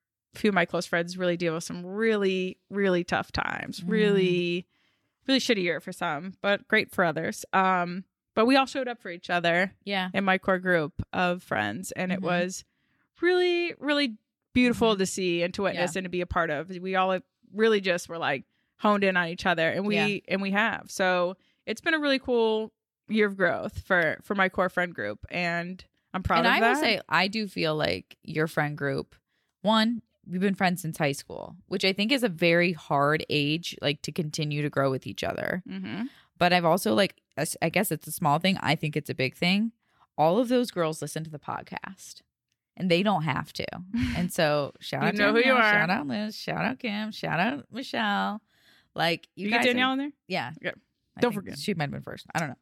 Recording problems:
none

